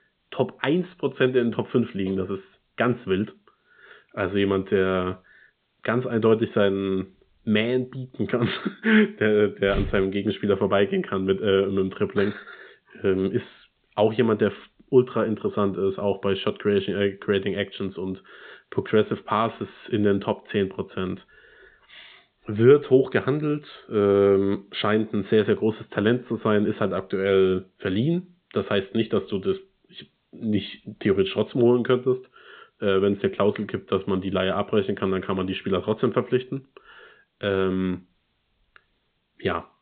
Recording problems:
high frequencies cut off; severe; nothing above 4 kHz
hiss; very faint; throughout; 50 dB below the speech

